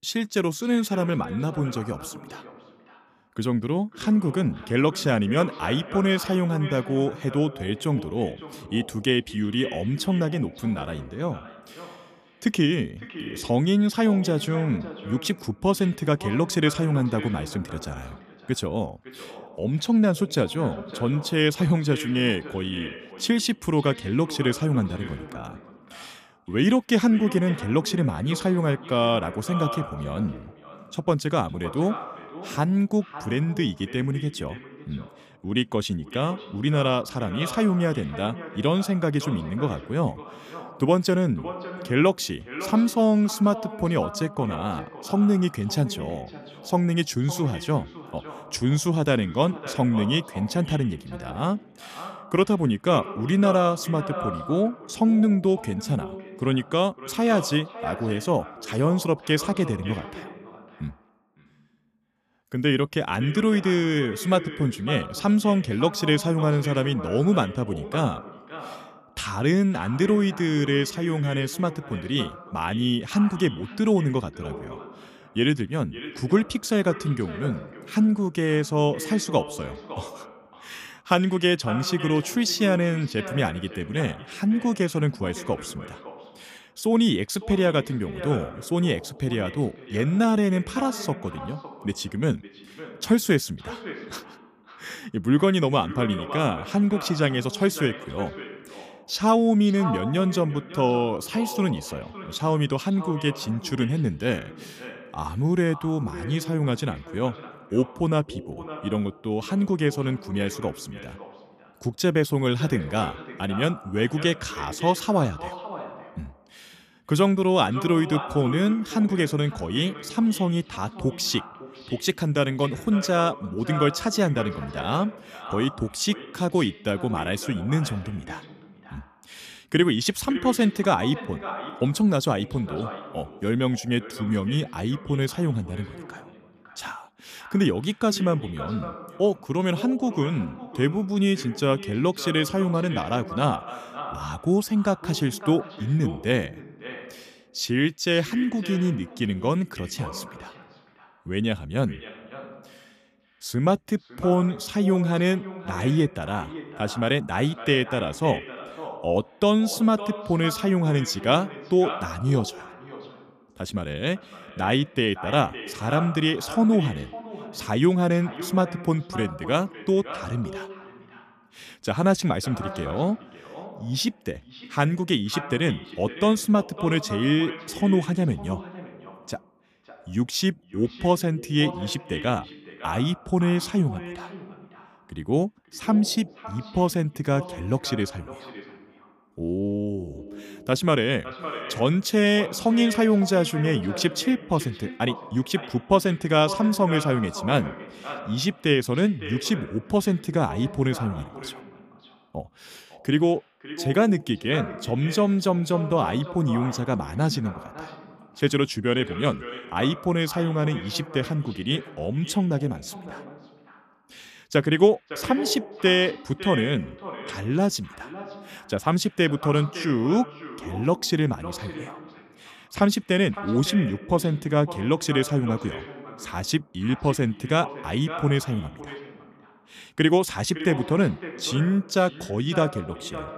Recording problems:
echo of what is said; noticeable; throughout; 560 ms later, 15 dB below the speech

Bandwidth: 14.5 kHz